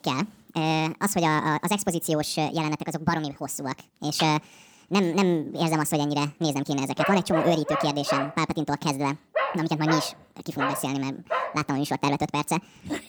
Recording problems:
wrong speed and pitch; too fast and too high; 1.6 times normal speed
dog barking; noticeable; from 7 to 12 s; peak 1 dB below the speech

